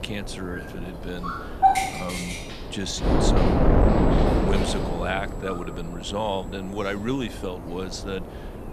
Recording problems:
animal sounds; very loud; throughout; 2 dB above the speech
wind noise on the microphone; heavy; 5 dB above the speech
high-pitched whine; faint; from 4 to 7.5 s; 7.5 kHz, 25 dB below the speech
chatter from many people; faint; throughout; 25 dB below the speech
hiss; faint; throughout; 30 dB below the speech

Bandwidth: 14 kHz